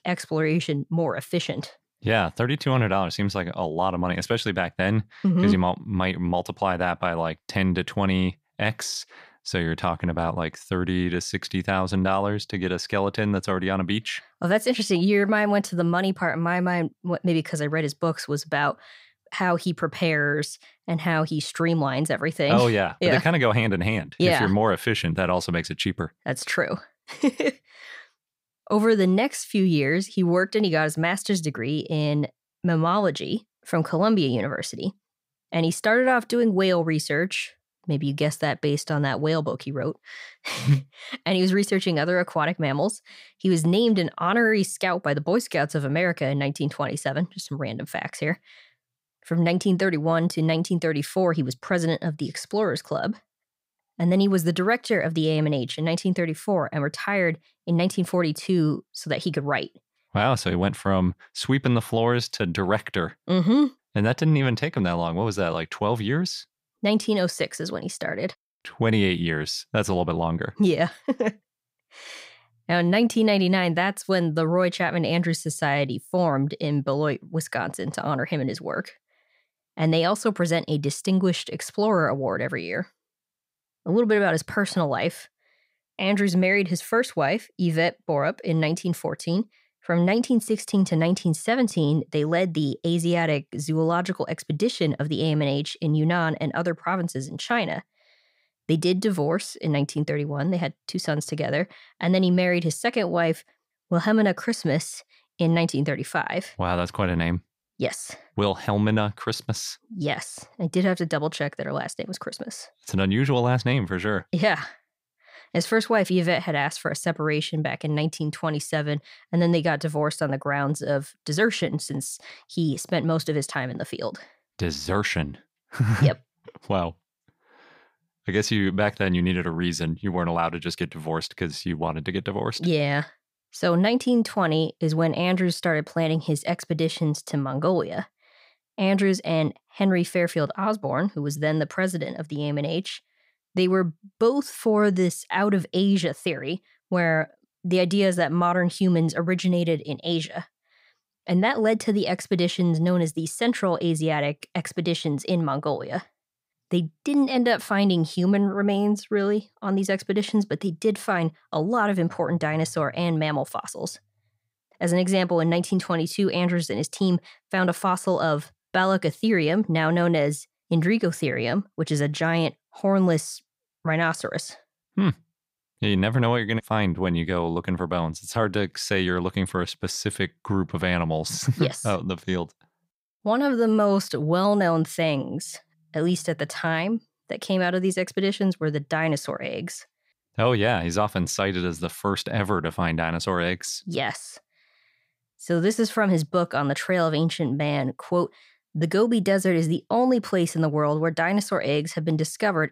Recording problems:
none

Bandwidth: 15.5 kHz